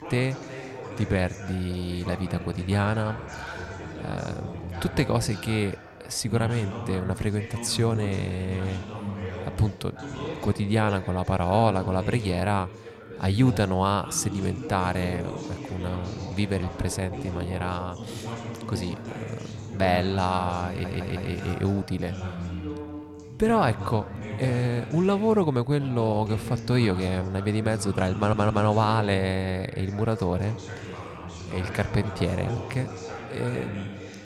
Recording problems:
background chatter; loud; throughout; 3 voices, 10 dB below the speech
audio stuttering; at 21 s and at 28 s

